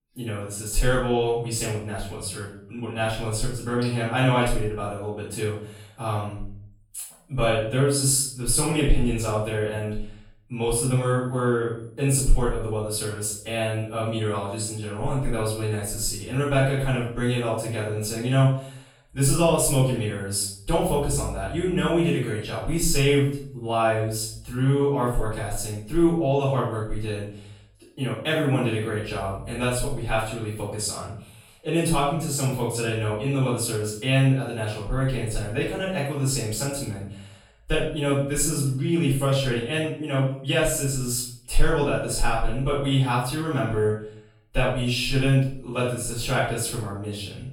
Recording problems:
off-mic speech; far
room echo; noticeable; dies away in 0.5 s

